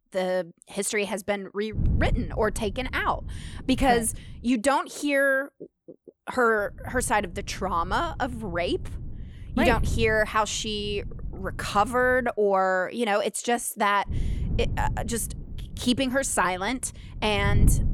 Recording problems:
wind noise on the microphone; occasional gusts; from 2 to 4.5 s, from 6.5 to 12 s and from 14 s on; 20 dB below the speech

